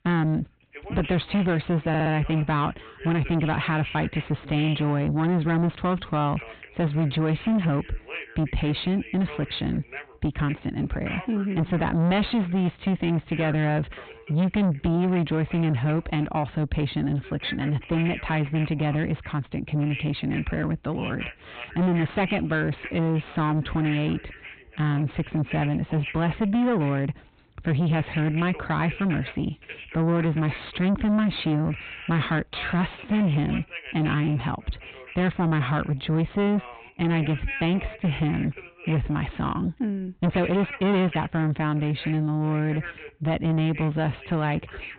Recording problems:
distortion; heavy; 7 dB below the speech
high frequencies cut off; severe; nothing above 4 kHz
voice in the background; noticeable; throughout; 15 dB below the speech
audio stuttering; at 2 s
uneven, jittery; strongly; from 6 to 41 s

